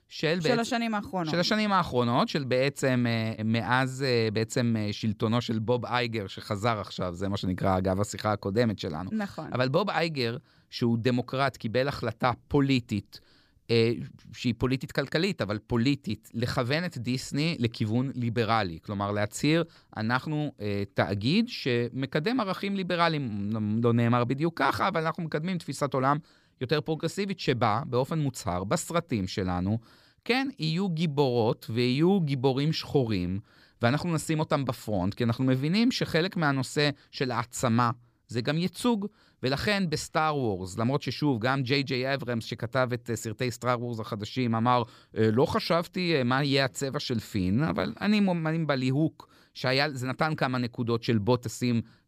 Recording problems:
none

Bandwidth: 15 kHz